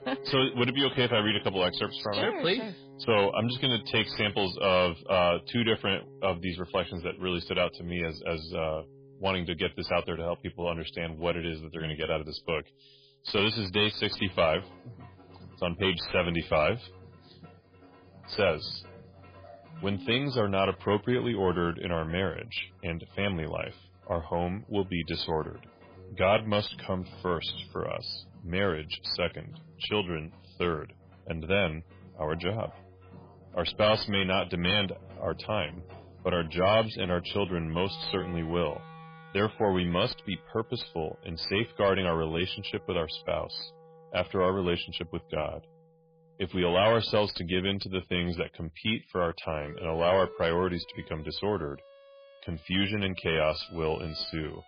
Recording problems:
garbled, watery; badly; nothing above 4.5 kHz
distortion; slight; 10 dB below the speech
background music; faint; throughout; 20 dB below the speech

